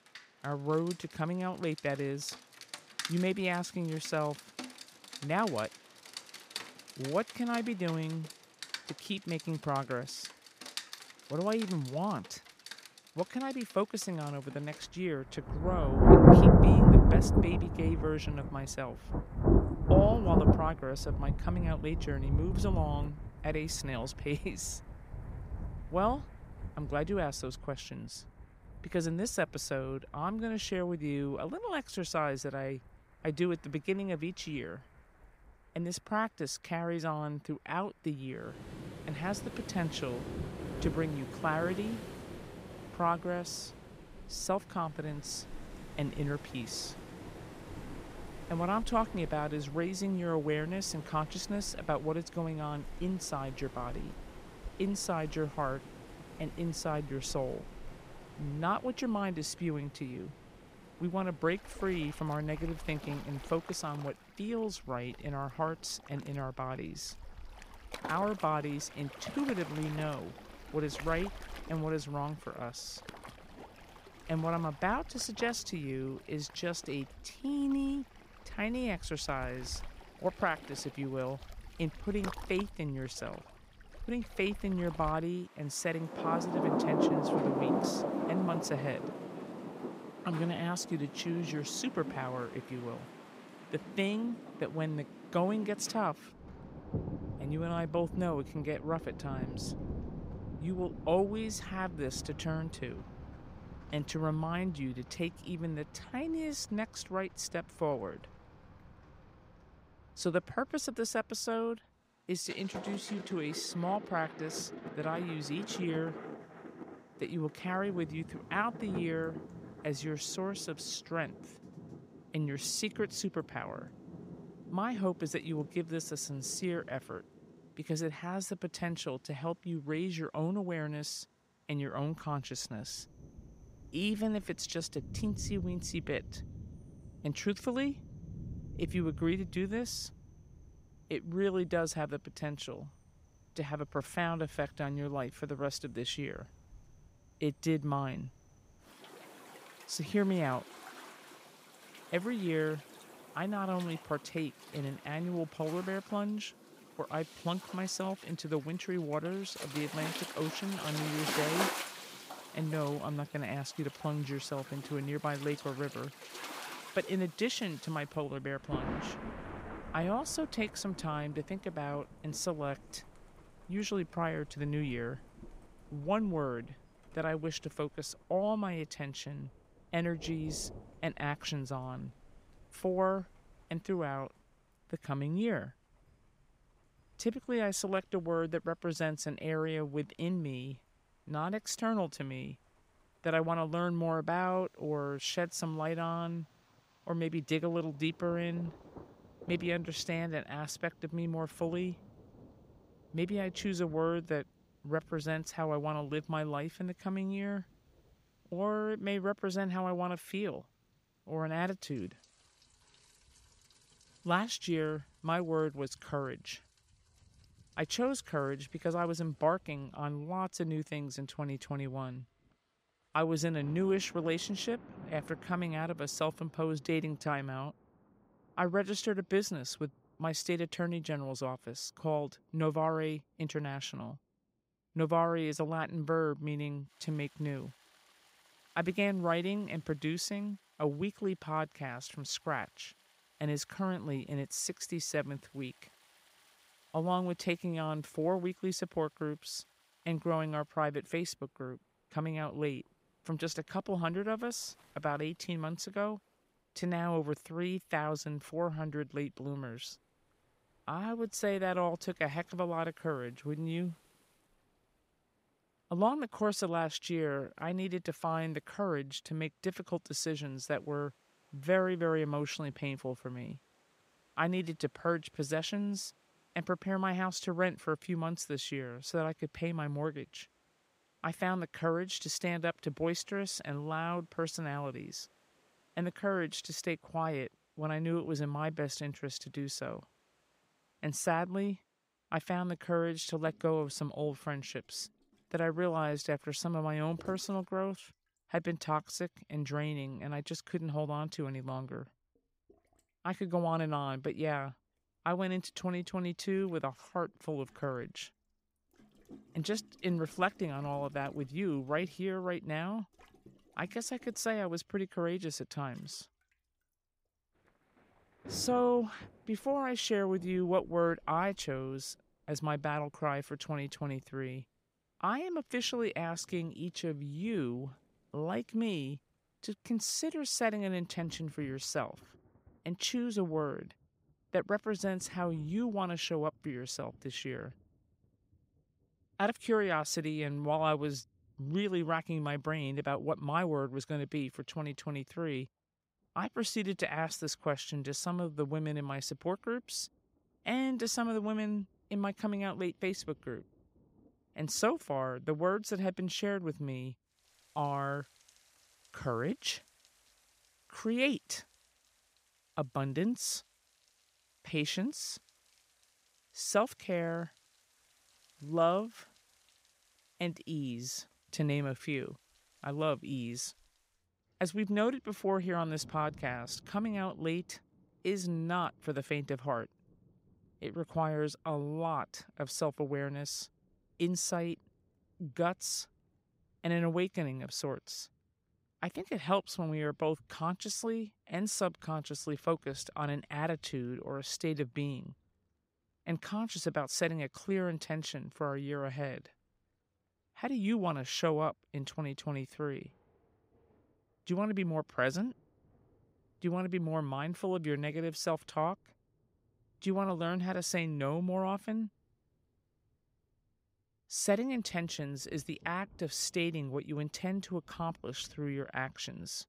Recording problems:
rain or running water; very loud; throughout; 1 dB above the speech

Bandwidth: 15.5 kHz